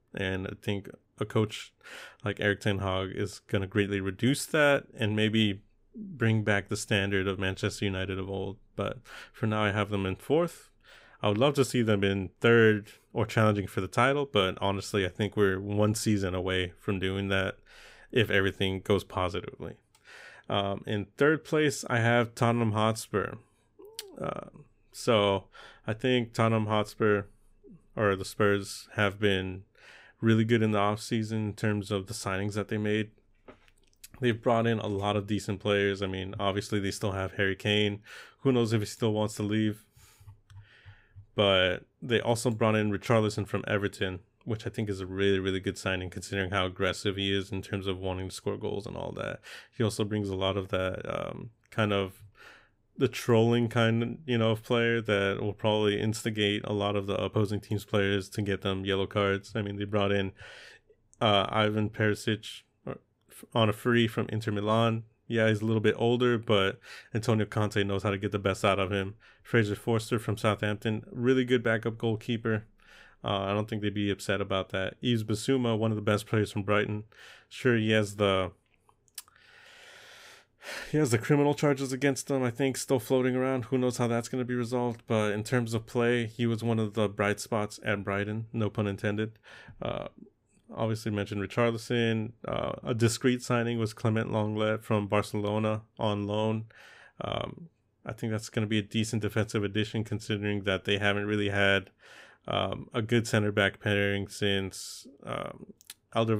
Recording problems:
abrupt cut into speech; at the end

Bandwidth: 15.5 kHz